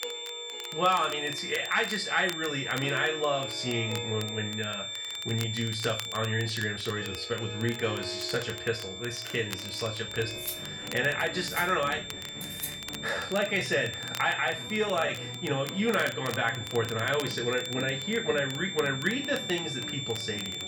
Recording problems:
off-mic speech; far
room echo; slight; dies away in 0.3 s
high-pitched whine; loud; throughout; 3.5 kHz, 6 dB below the speech
background music; noticeable; throughout; 15 dB below the speech
crackle, like an old record; noticeable; 15 dB below the speech
uneven, jittery; slightly; from 6.5 to 15 s
clattering dishes; noticeable; from 10 to 13 s; peak 7 dB below the speech

